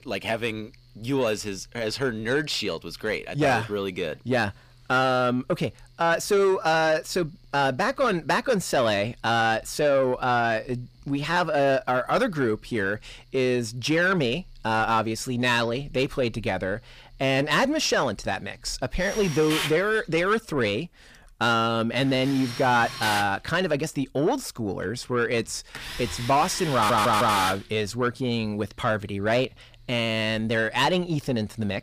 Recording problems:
distortion; slight; 10 dB below the speech
machinery noise; loud; throughout; 6 dB below the speech
audio stuttering; at 27 s

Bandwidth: 15 kHz